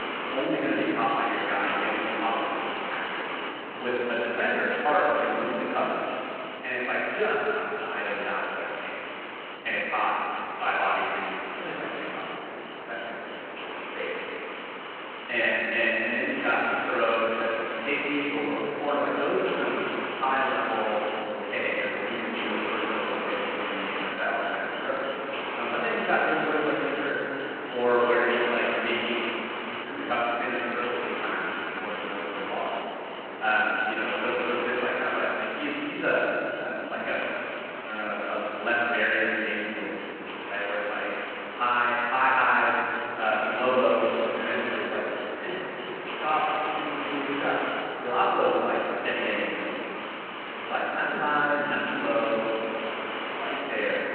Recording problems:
room echo; strong; dies away in 2.7 s
off-mic speech; far
muffled; very; fading above 3 kHz
phone-call audio
hiss; loud; throughout; 7 dB below the speech
uneven, jittery; strongly; from 3 to 52 s

